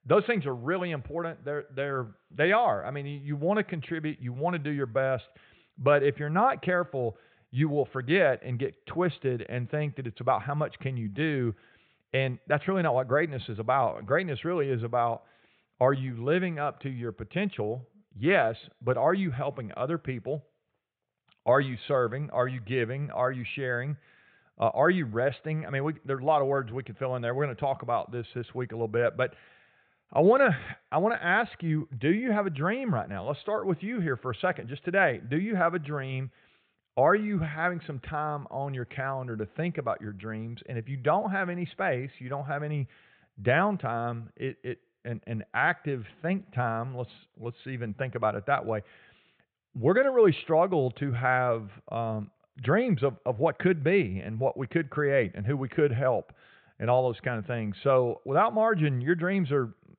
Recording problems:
high frequencies cut off; severe; nothing above 4 kHz

